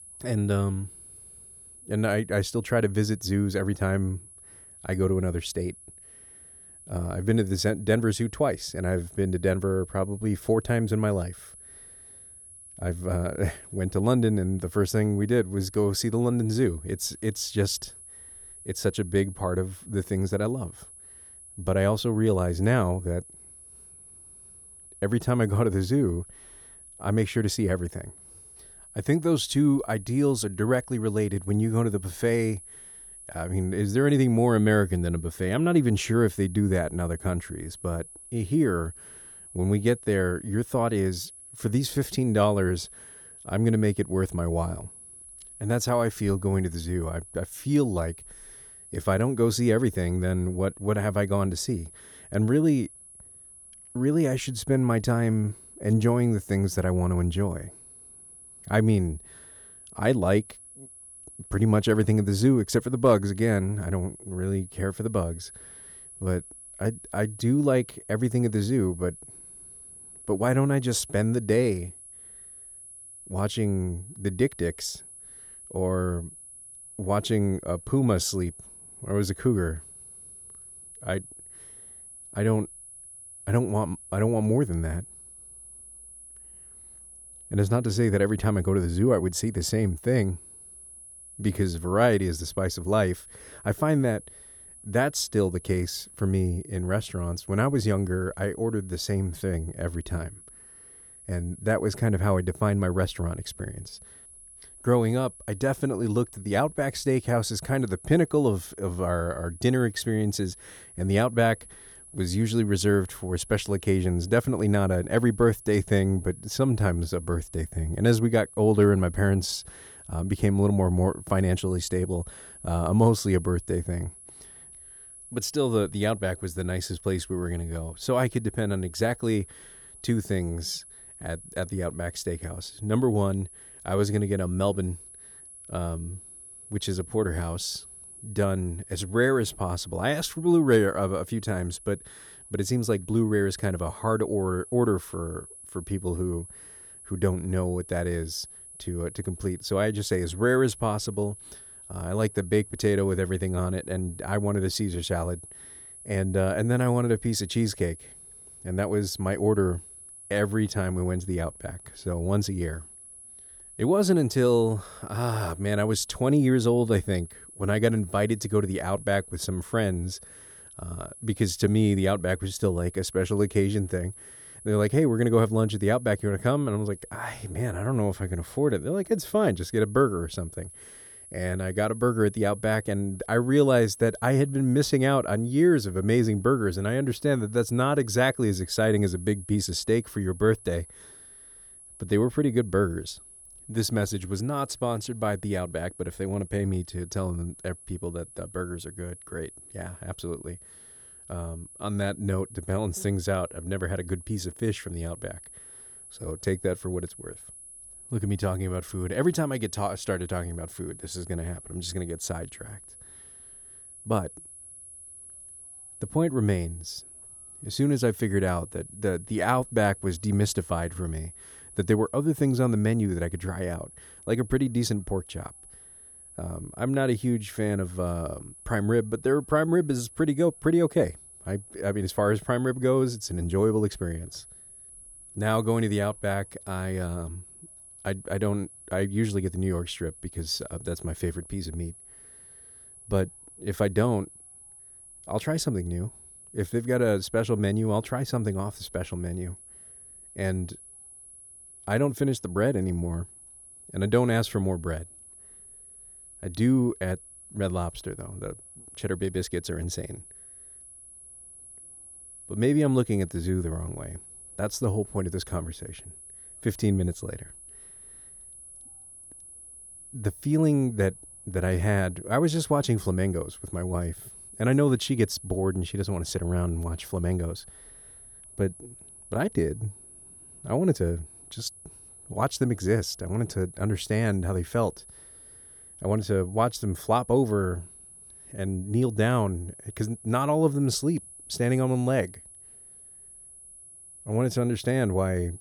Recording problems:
high-pitched whine; noticeable; throughout; 10.5 kHz, 20 dB below the speech

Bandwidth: 18 kHz